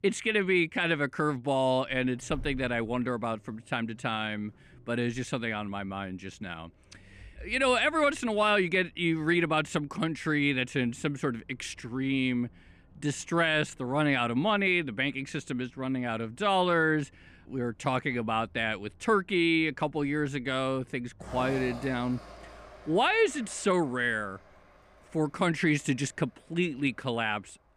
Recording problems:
traffic noise; faint; throughout; 25 dB below the speech

